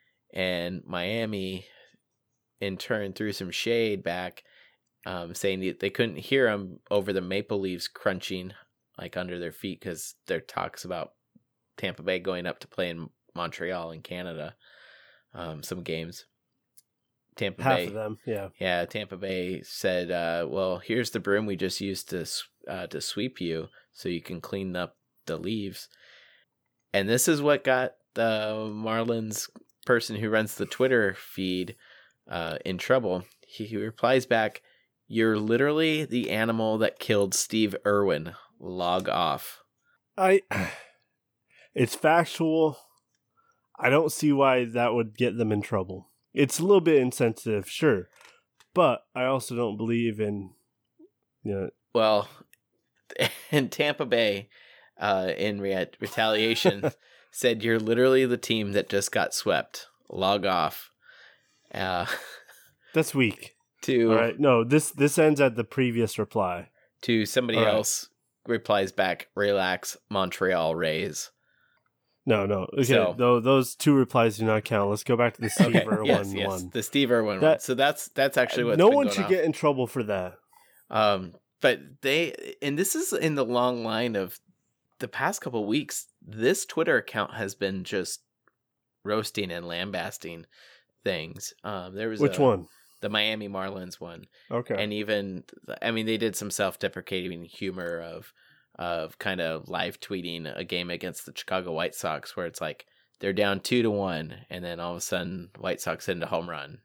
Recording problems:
none

